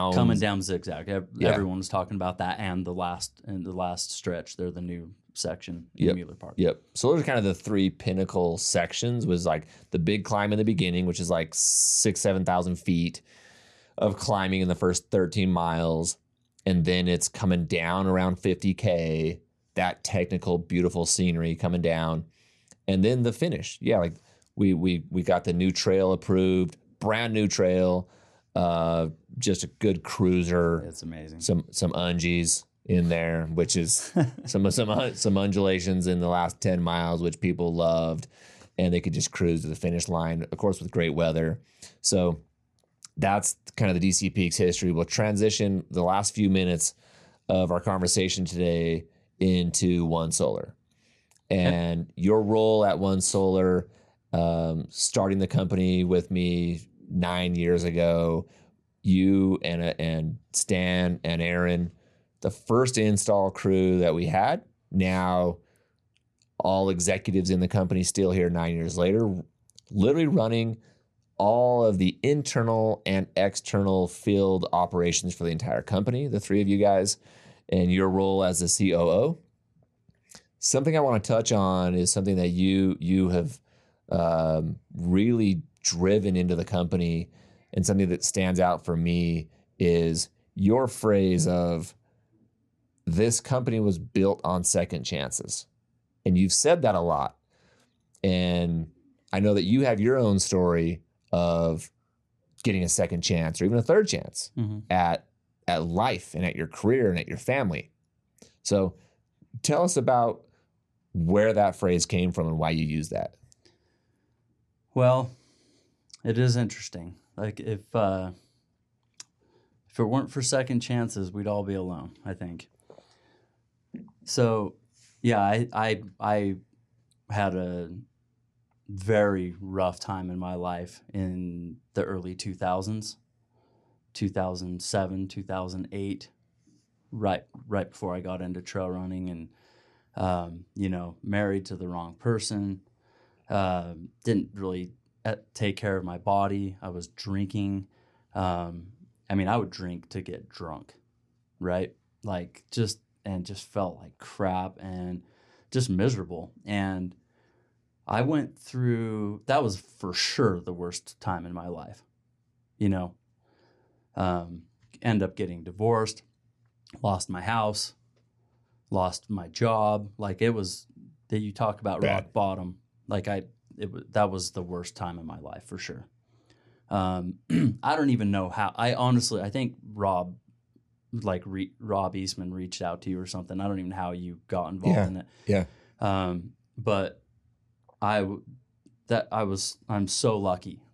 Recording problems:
abrupt cut into speech; at the start

